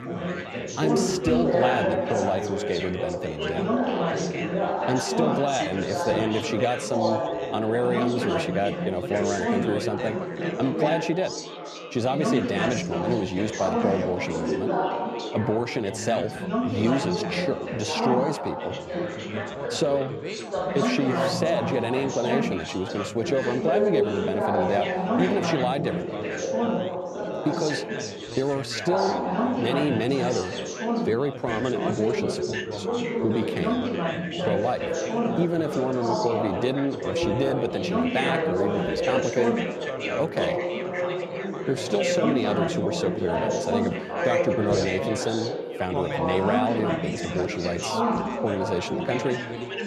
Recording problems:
chatter from many people; very loud; throughout; as loud as the speech

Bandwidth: 14.5 kHz